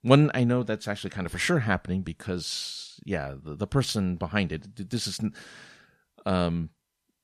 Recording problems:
none

